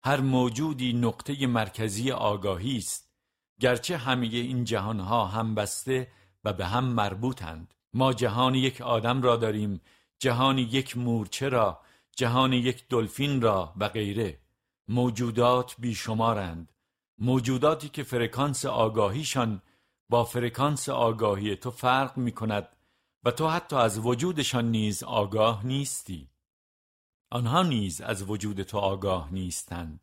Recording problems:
none

